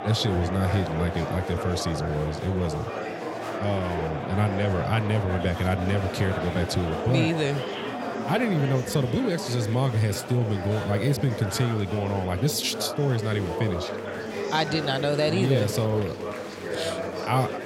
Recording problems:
murmuring crowd; loud; throughout; 6 dB below the speech

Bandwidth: 16 kHz